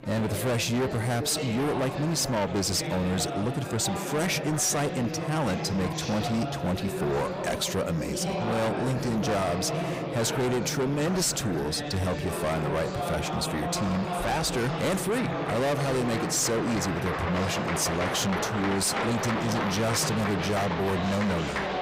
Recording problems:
distortion; heavy; 7 dB below the speech
chatter from many people; loud; throughout; 4 dB below the speech

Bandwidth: 15.5 kHz